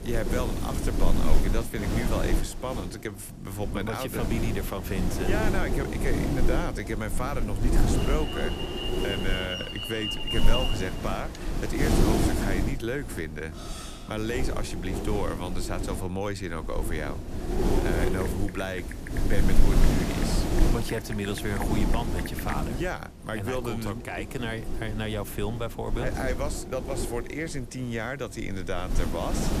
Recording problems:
wind noise on the microphone; heavy; 2 dB below the speech
alarm; loud; from 8 to 12 s; peak 3 dB above the speech
clattering dishes; noticeable; at 14 s; peak 8 dB below the speech
keyboard typing; noticeable; from 18 to 23 s; peak 7 dB below the speech

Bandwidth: 14.5 kHz